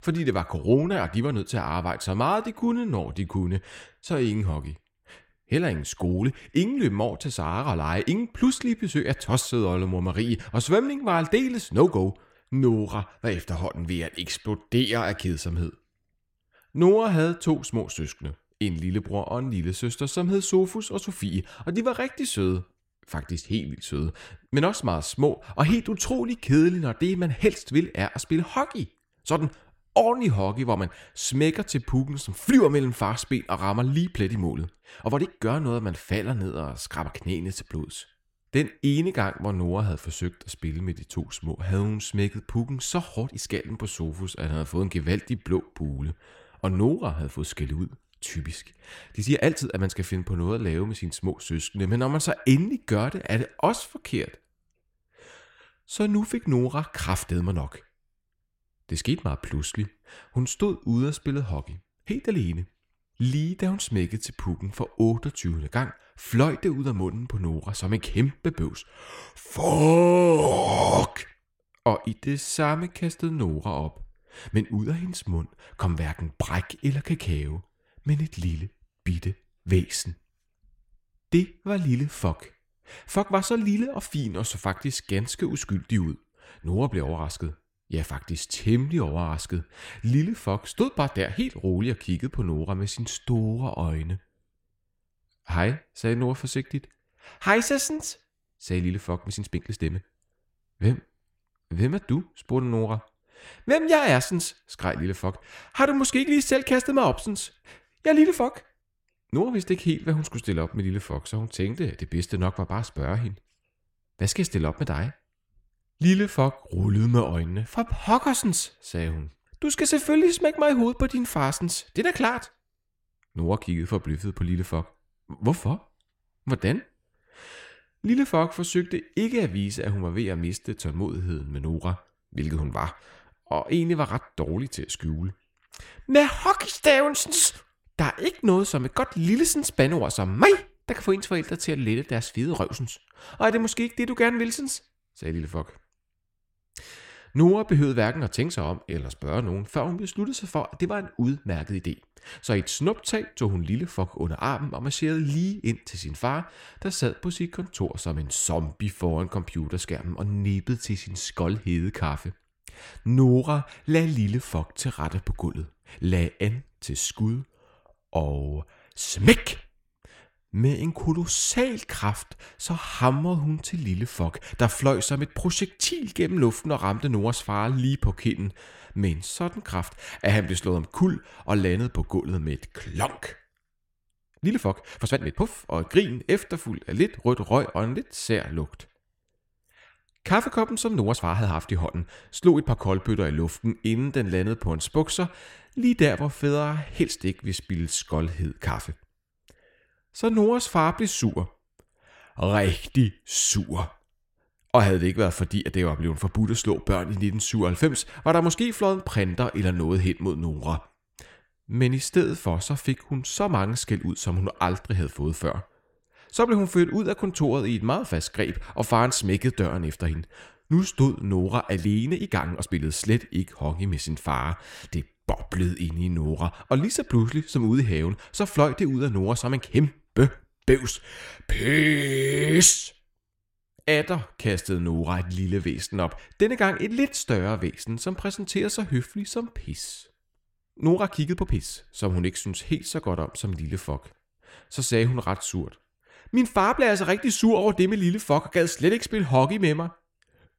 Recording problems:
echo of what is said; faint; throughout; 80 ms later, 25 dB below the speech
uneven, jittery; strongly; from 4 s to 4:02

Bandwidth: 16.5 kHz